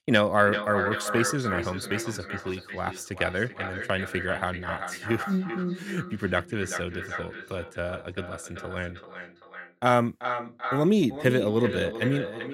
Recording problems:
echo of what is said; strong; throughout; 390 ms later, 7 dB below the speech

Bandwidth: 16 kHz